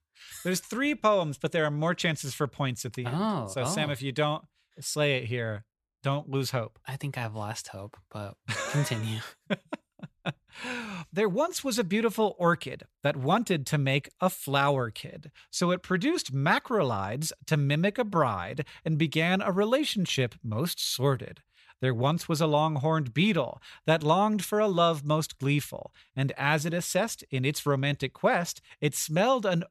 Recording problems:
none

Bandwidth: 13.5 kHz